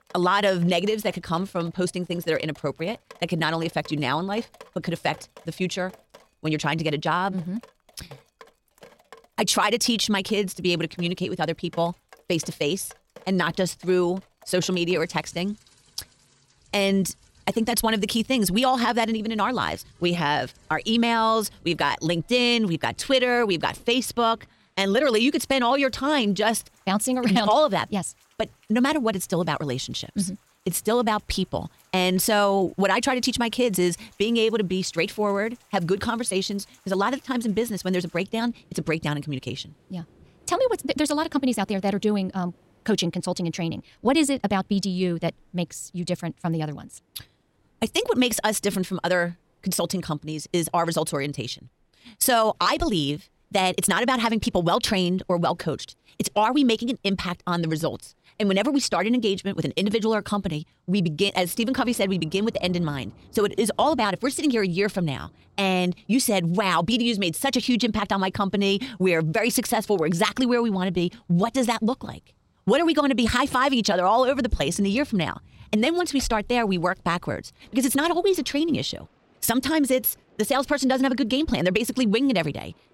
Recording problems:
wrong speed, natural pitch; too fast; 1.6 times normal speed
rain or running water; faint; throughout; 30 dB below the speech

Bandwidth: 16 kHz